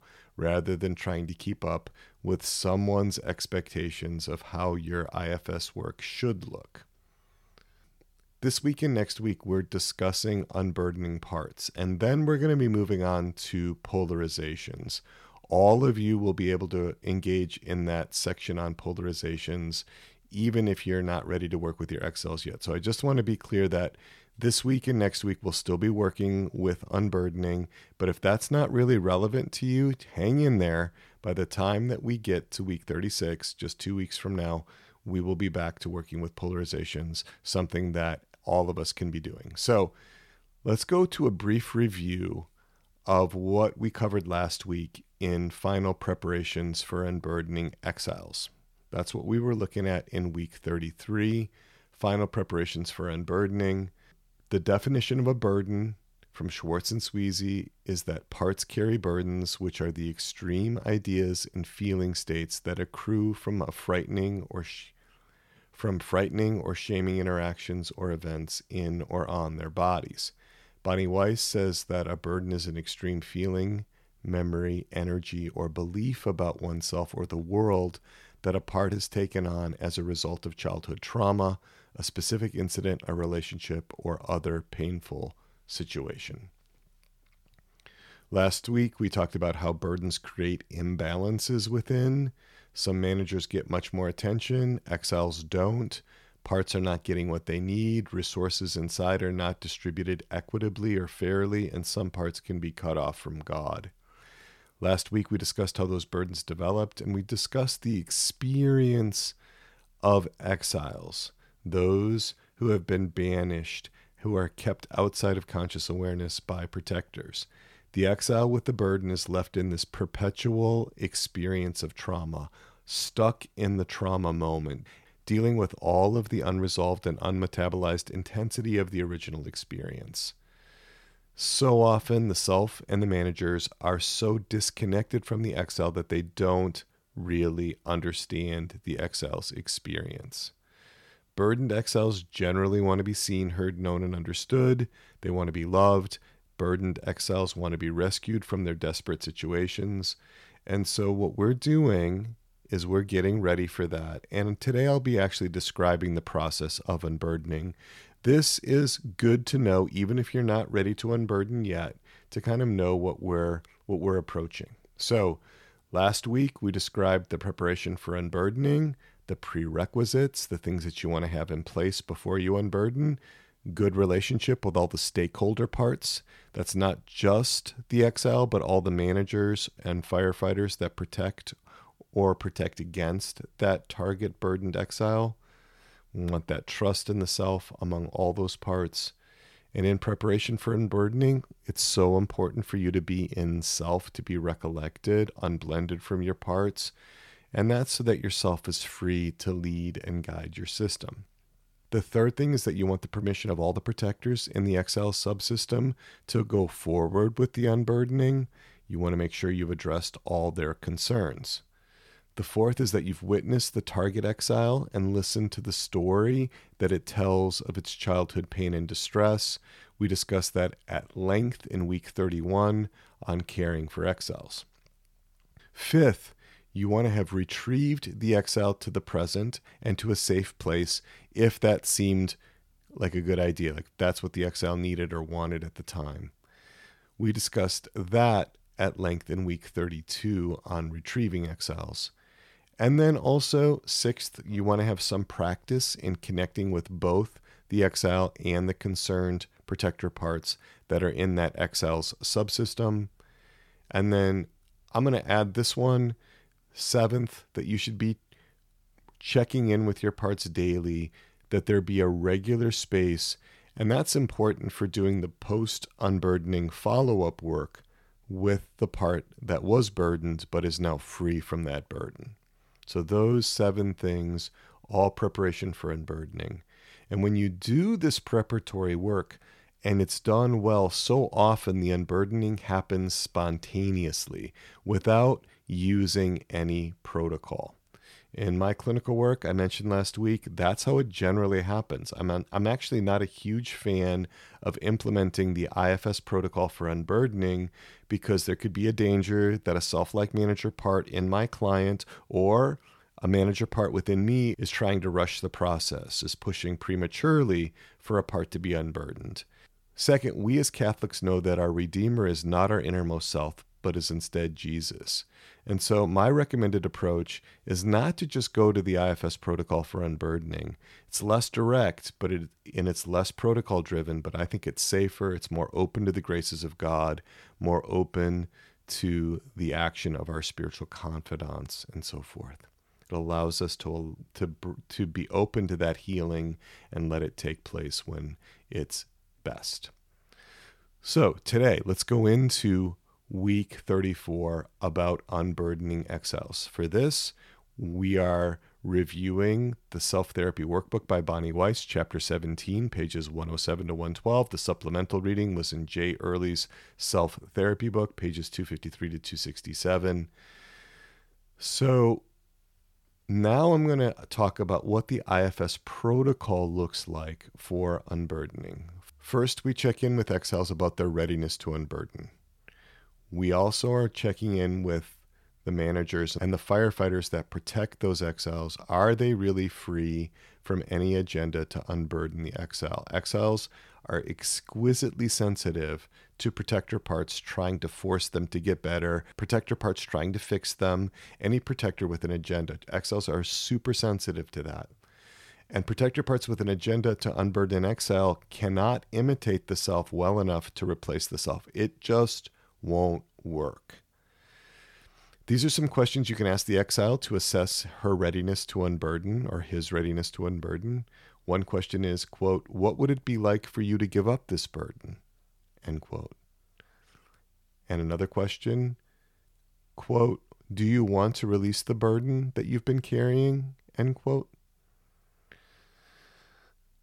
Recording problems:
none

